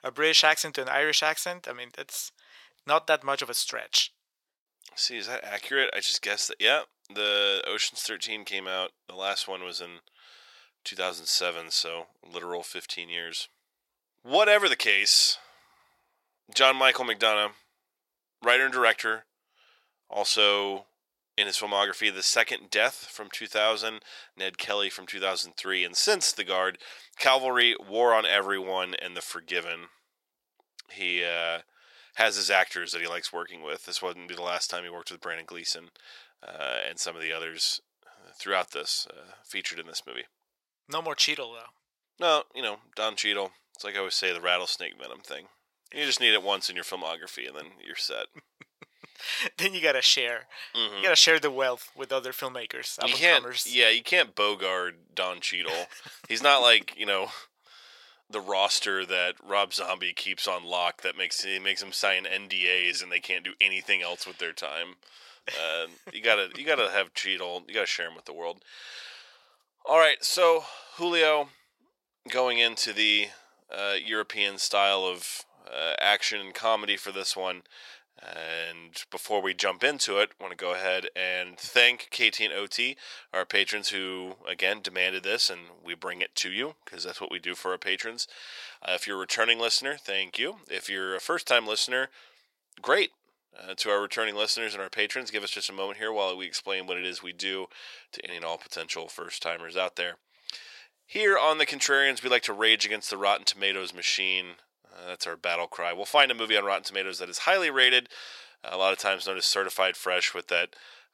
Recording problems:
thin; very; fading below 750 Hz

